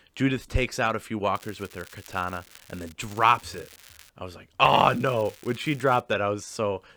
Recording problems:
crackling; faint; from 1.5 to 3 s, from 3 to 4 s and from 4.5 to 6 s; 25 dB below the speech

